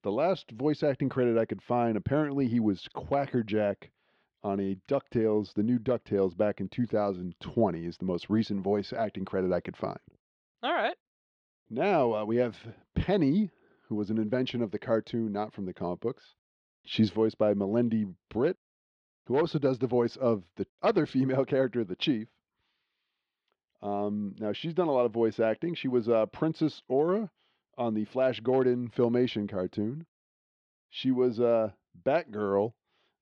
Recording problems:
muffled; very slightly; fading above 4 kHz

